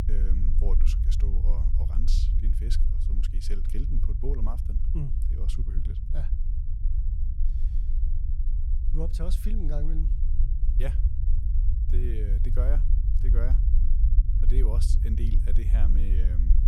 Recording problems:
low rumble; loud; throughout; 4 dB below the speech

